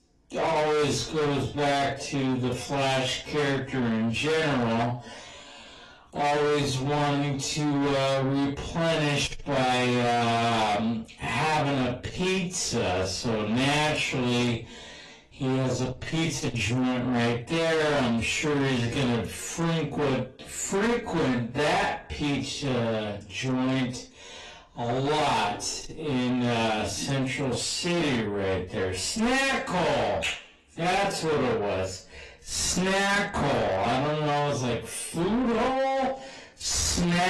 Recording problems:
distortion; heavy; 6 dB below the speech
off-mic speech; far
wrong speed, natural pitch; too slow; 0.5 times normal speed
room echo; slight; dies away in 0.2 s
garbled, watery; slightly; nothing above 11.5 kHz
abrupt cut into speech; at the end

